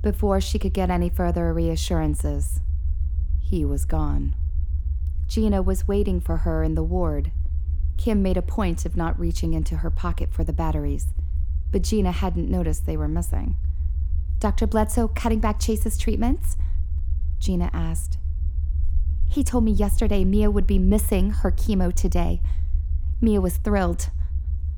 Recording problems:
low rumble; noticeable; throughout; 20 dB below the speech

